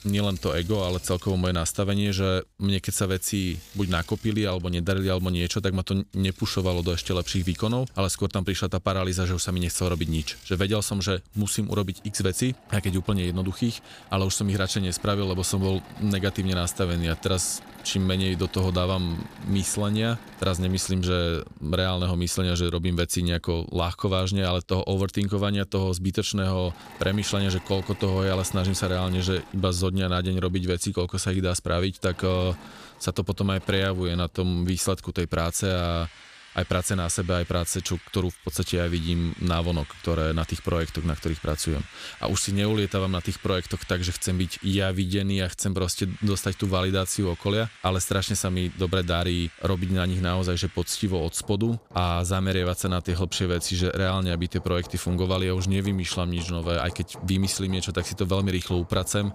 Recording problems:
machinery noise; faint; throughout; 20 dB below the speech

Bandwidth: 15 kHz